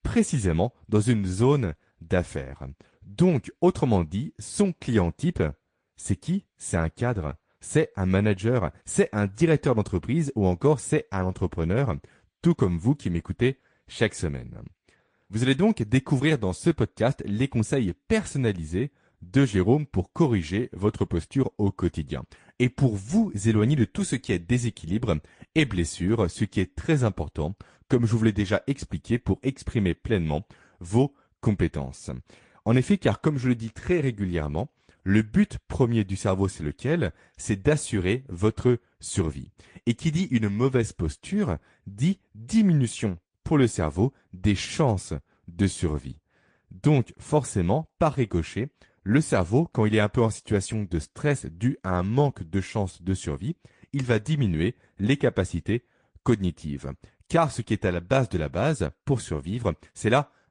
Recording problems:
garbled, watery; slightly; nothing above 9 kHz

